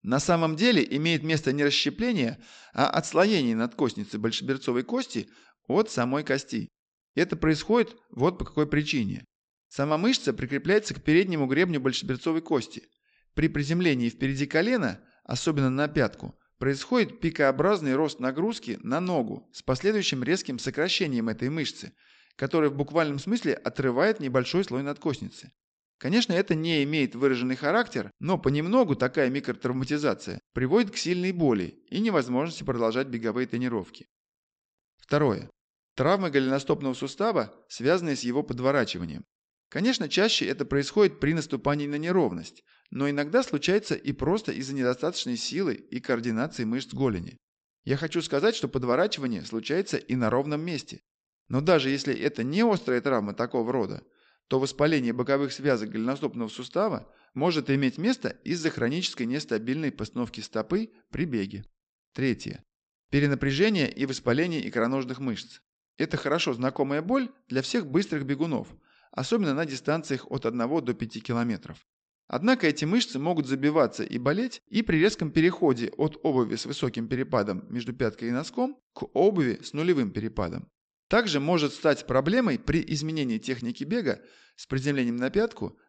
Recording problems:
high frequencies cut off; noticeable; nothing above 8 kHz

